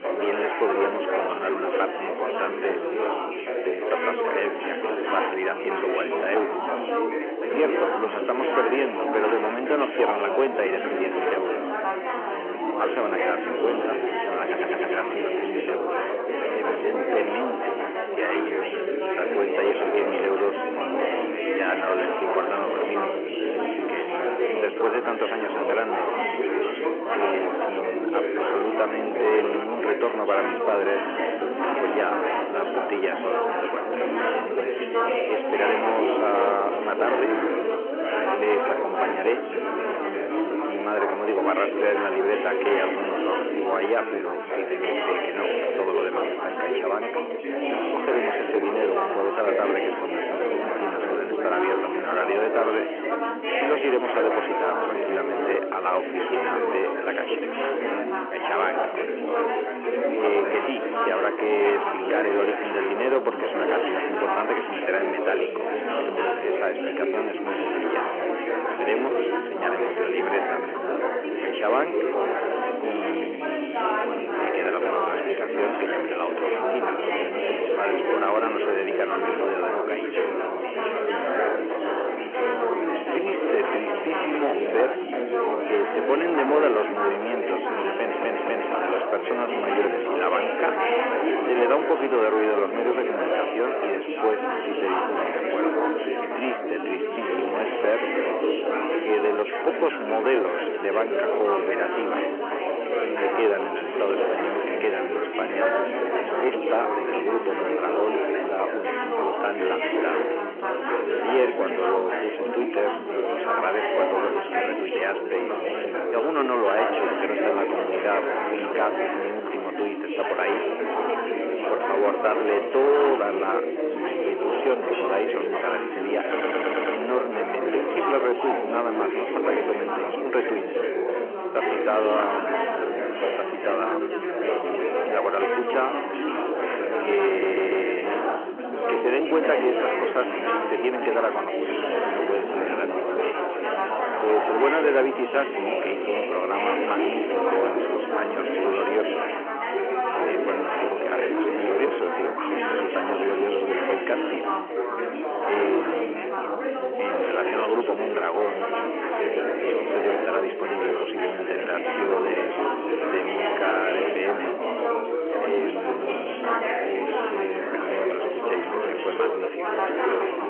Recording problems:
phone-call audio
distortion; slight; 15 dB below the speech
chatter from many people; very loud; throughout; 1 dB above the speech
audio stuttering; 4 times, first at 14 s

